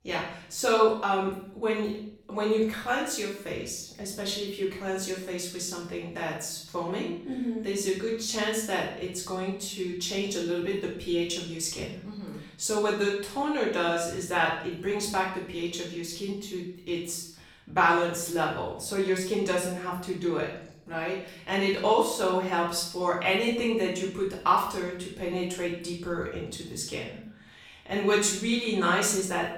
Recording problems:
off-mic speech; far
room echo; noticeable; dies away in 0.6 s

